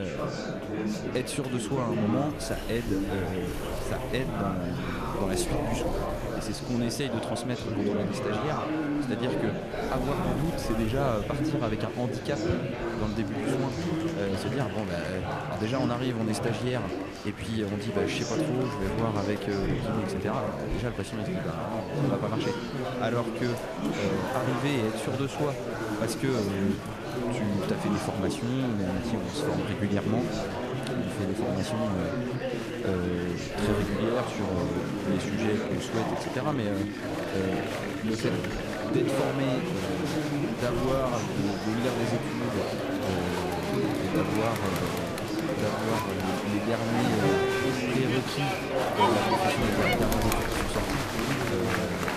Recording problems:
murmuring crowd; very loud; throughout; 1 dB above the speech
wind noise on the microphone; occasional gusts; 15 dB below the speech
abrupt cut into speech; at the start

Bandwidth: 14.5 kHz